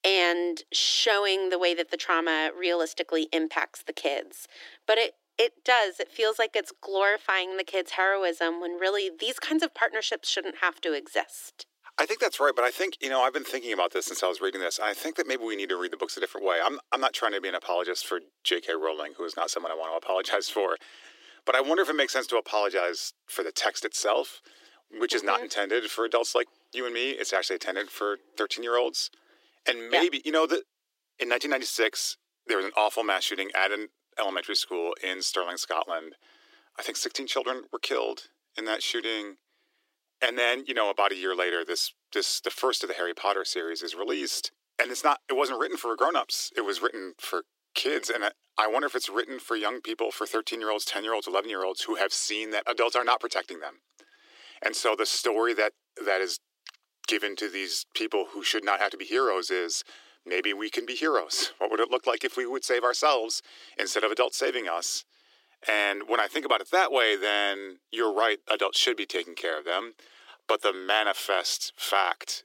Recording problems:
thin; very; fading below 300 Hz

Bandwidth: 16 kHz